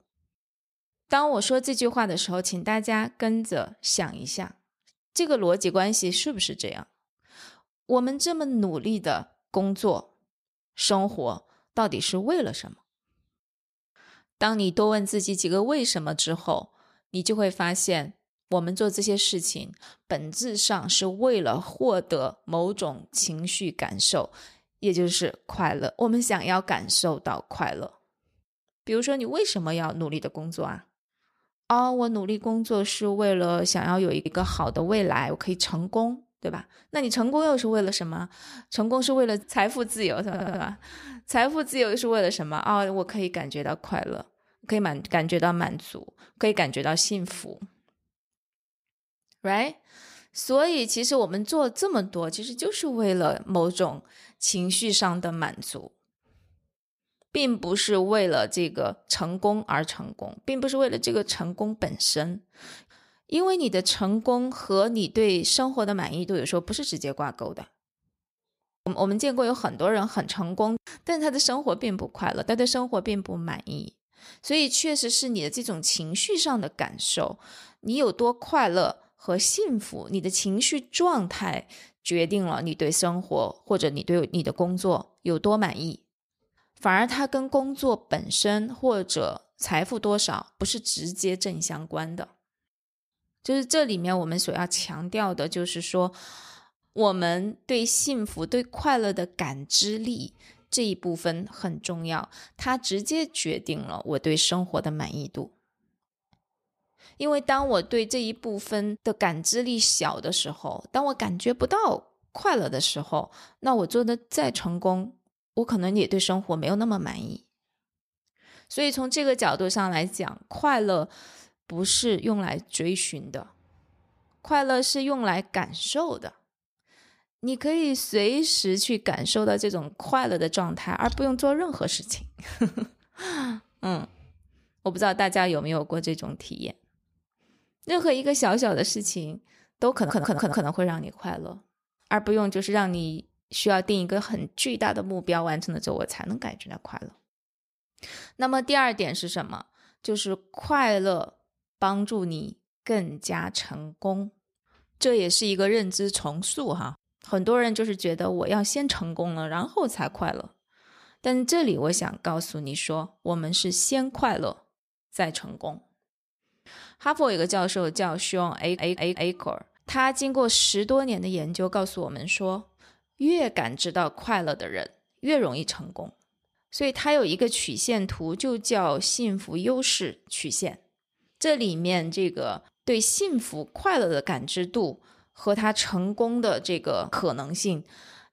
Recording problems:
audio stuttering; at 40 s, at 2:20 and at 2:49

